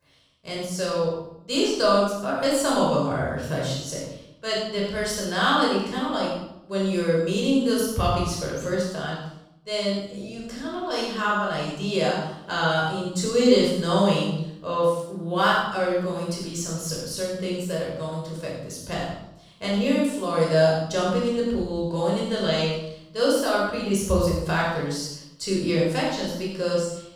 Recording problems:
room echo; strong; dies away in 0.7 s
off-mic speech; far

